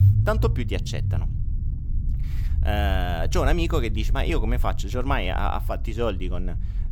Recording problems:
low rumble; noticeable; throughout; 15 dB below the speech

